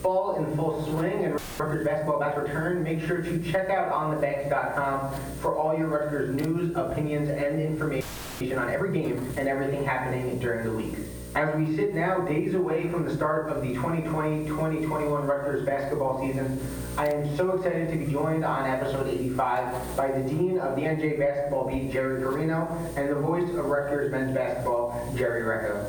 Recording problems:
off-mic speech; far
muffled; very; fading above 2 kHz
room echo; noticeable; dies away in 0.6 s
squashed, flat; somewhat
electrical hum; faint; throughout; 60 Hz, 20 dB below the speech
audio freezing; at 1.5 s and at 8 s

